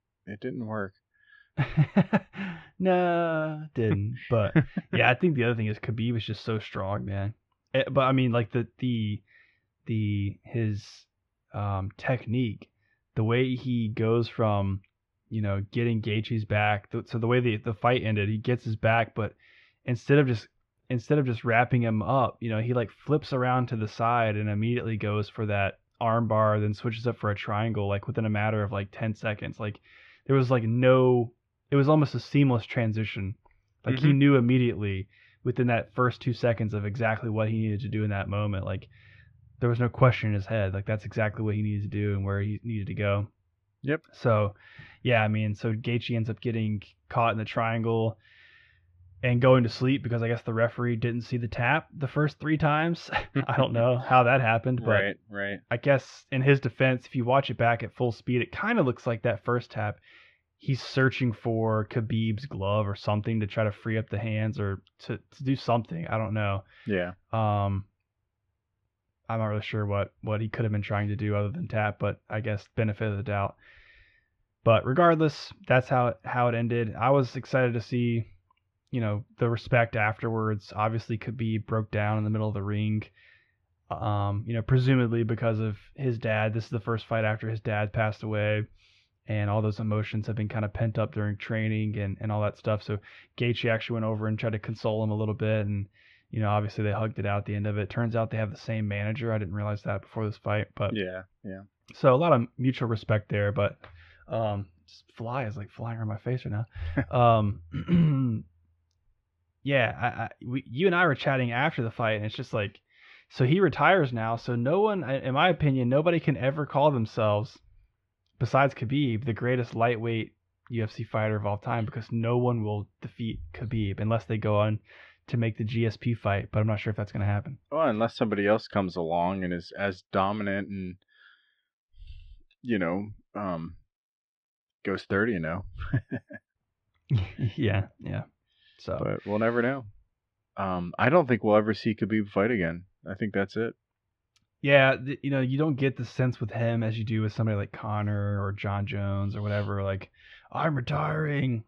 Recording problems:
muffled; slightly; fading above 3 kHz

